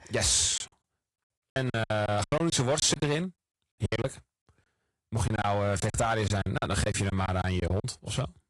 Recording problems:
distortion; slight; 5% of the sound clipped
garbled, watery; slightly
choppy; very; 15% of the speech affected

